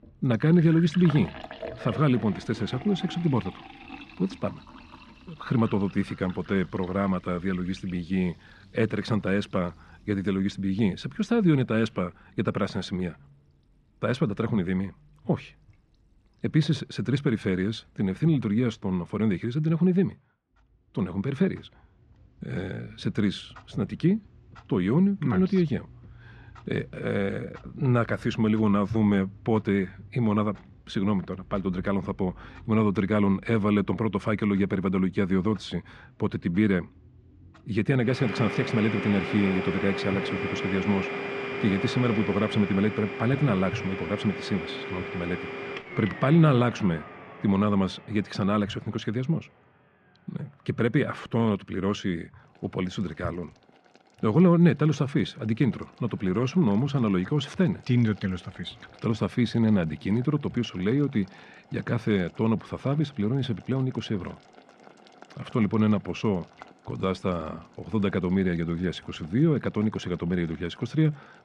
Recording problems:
muffled; slightly; fading above 3 kHz
household noises; noticeable; throughout; 10 dB below the speech

